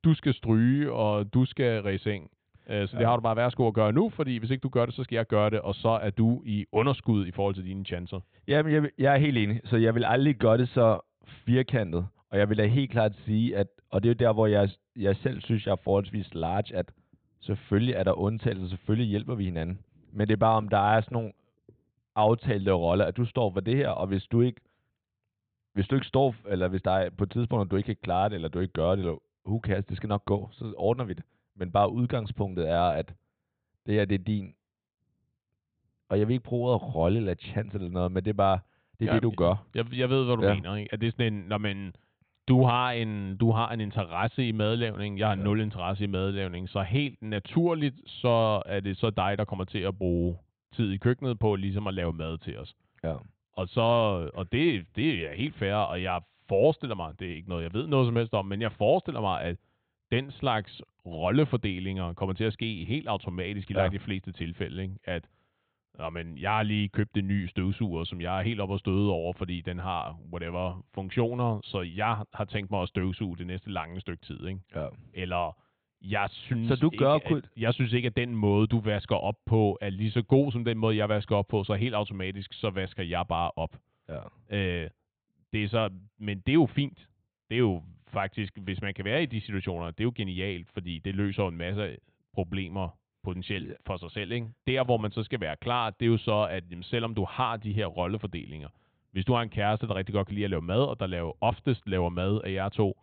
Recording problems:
high frequencies cut off; severe; nothing above 4 kHz

